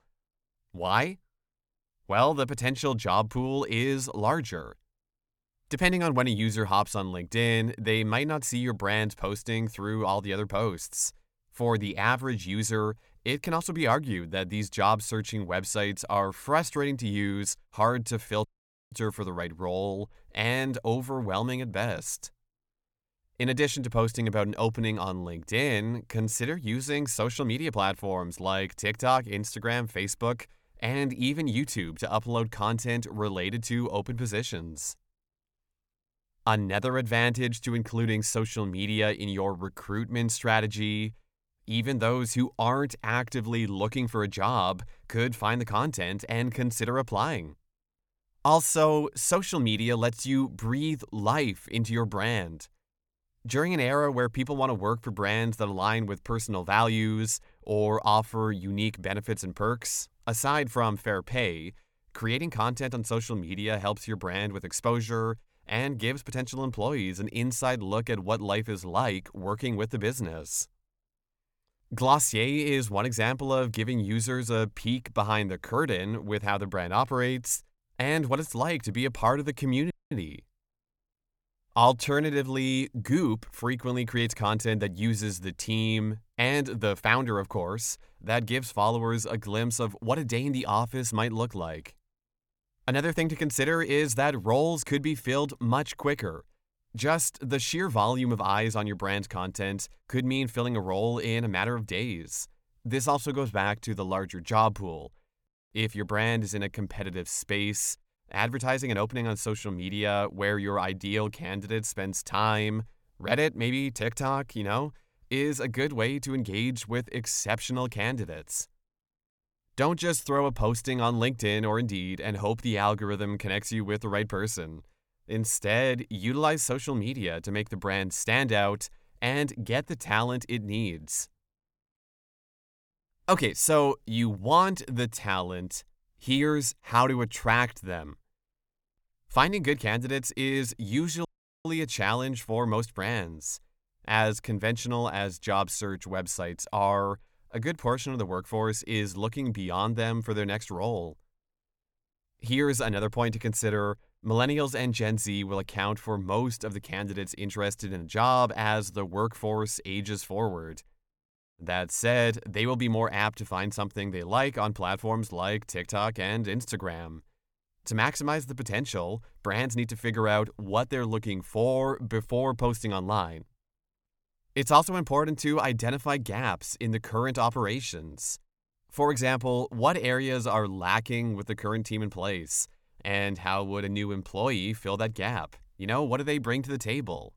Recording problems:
audio cutting out; at 18 s, at 1:20 and at 2:21

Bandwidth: 18.5 kHz